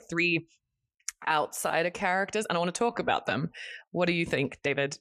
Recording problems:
uneven, jittery; strongly

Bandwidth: 14 kHz